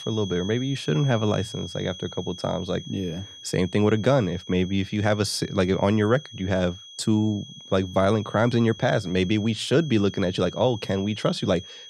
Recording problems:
high-pitched whine; noticeable; throughout; 3.5 kHz, 15 dB below the speech

